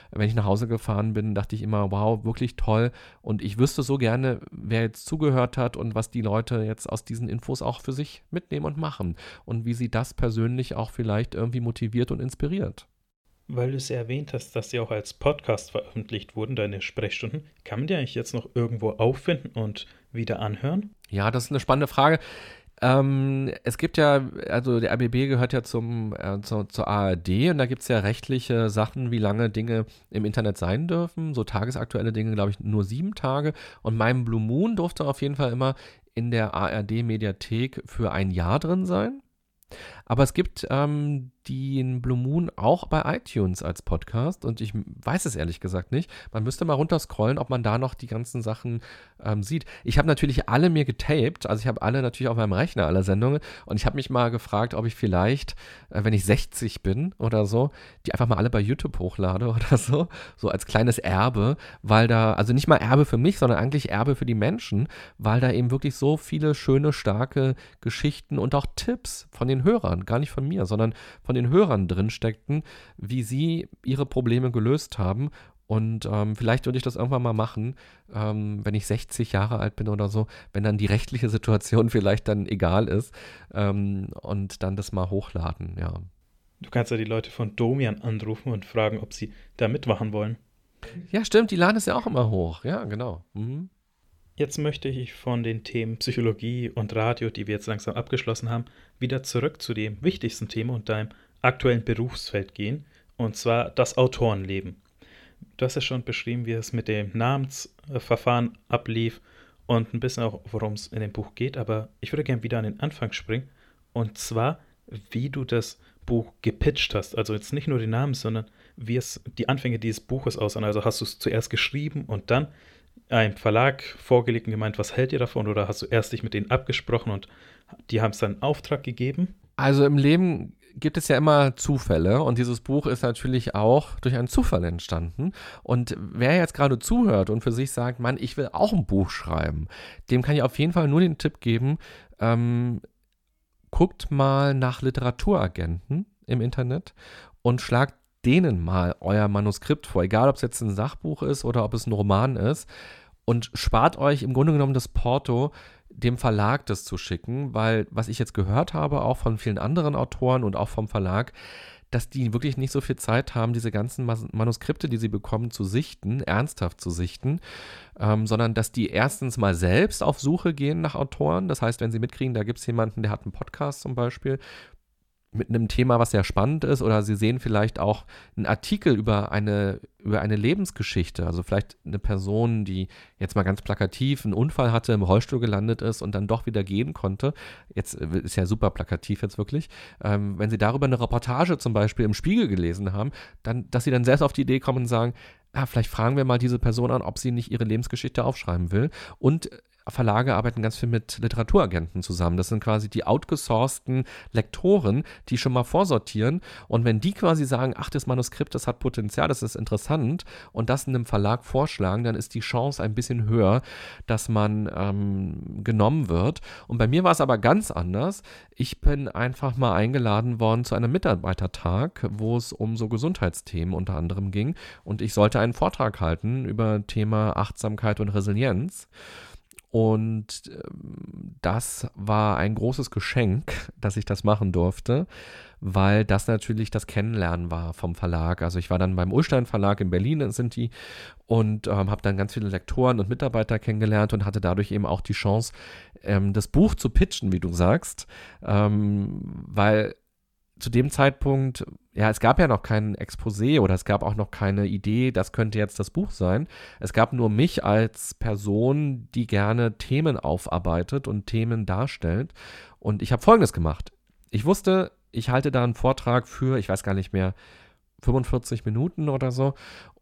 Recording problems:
uneven, jittery; strongly; from 13 s to 3:40

